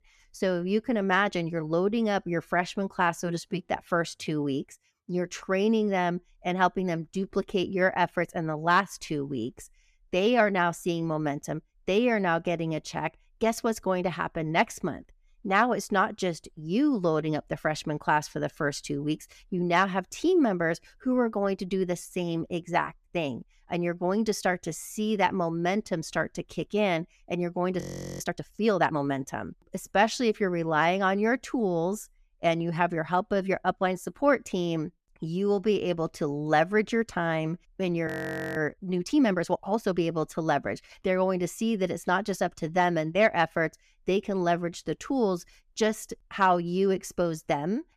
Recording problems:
audio freezing; at 28 s and at 38 s

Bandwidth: 14.5 kHz